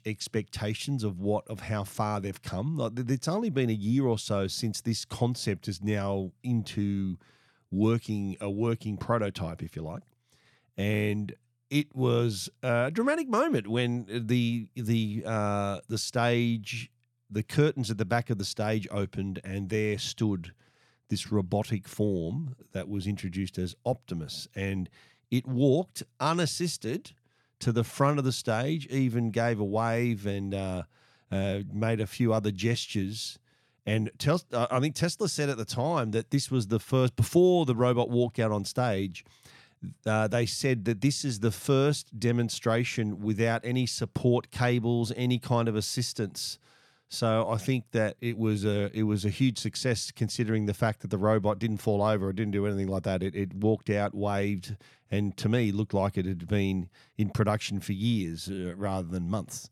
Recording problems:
none

